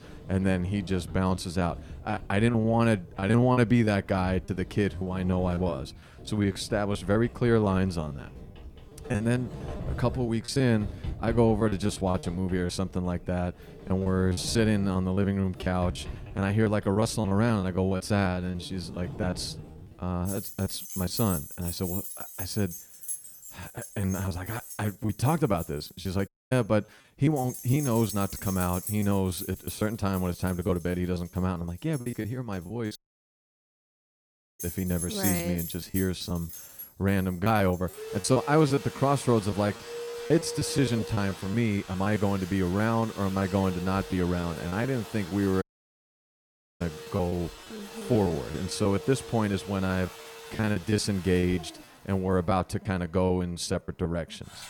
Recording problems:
household noises; noticeable; throughout; 10 dB below the speech
choppy; very; 11% of the speech affected
audio cutting out; at 26 s, at 33 s for 1.5 s and at 46 s for 1 s

